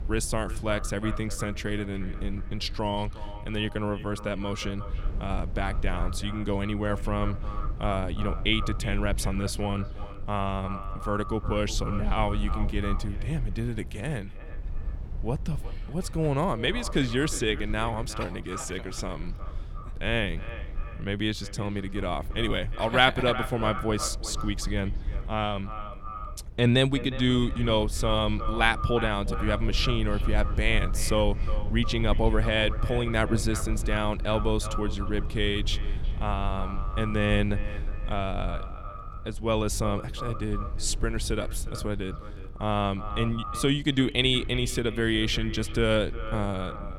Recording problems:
echo of what is said; noticeable; throughout; 360 ms later, 15 dB below the speech
low rumble; faint; throughout; 20 dB below the speech

